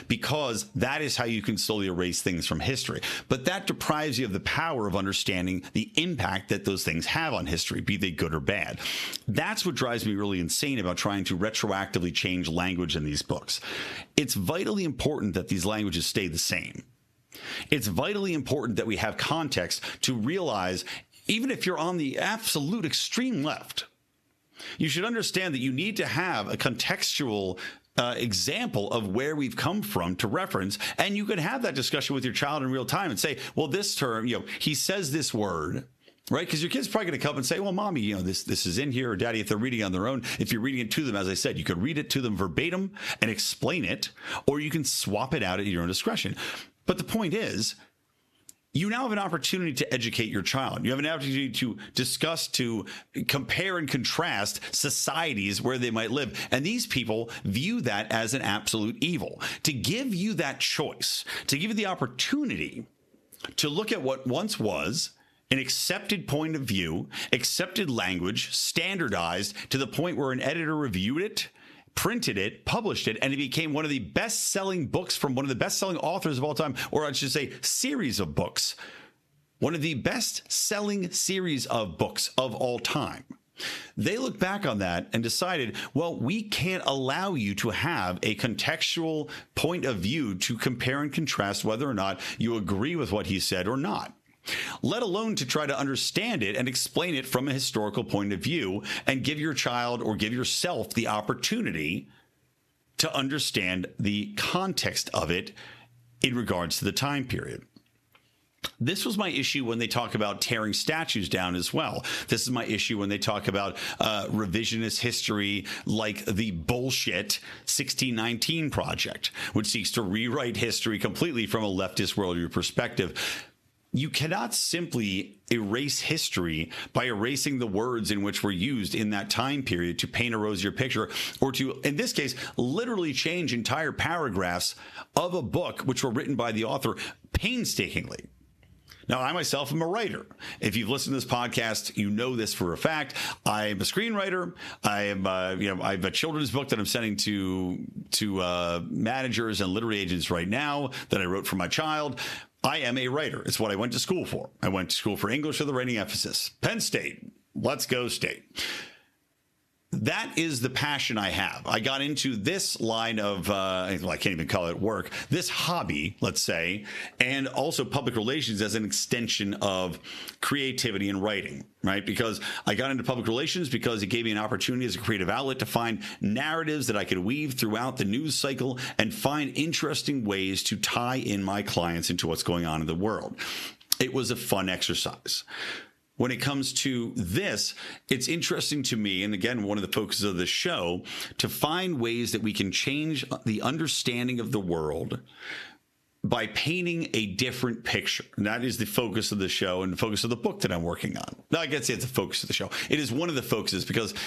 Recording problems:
squashed, flat; heavily

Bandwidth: 13.5 kHz